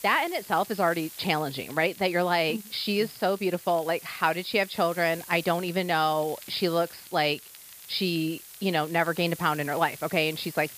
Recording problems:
high frequencies cut off; noticeable; nothing above 5.5 kHz
hiss; noticeable; throughout; 15 dB below the speech
crackle, like an old record; faint; 25 dB below the speech

